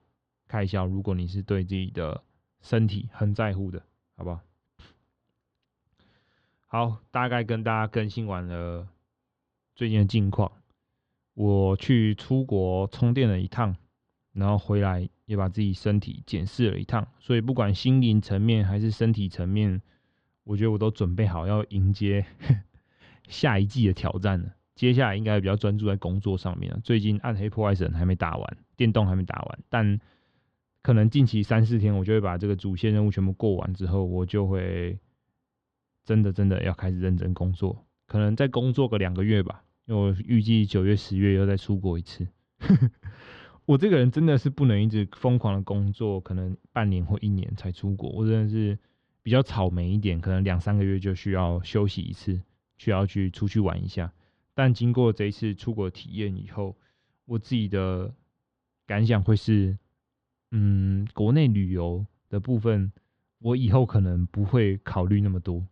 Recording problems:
muffled; slightly; fading above 3.5 kHz

